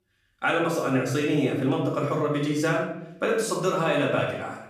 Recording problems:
off-mic speech; far
room echo; noticeable; dies away in 0.6 s

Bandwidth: 15 kHz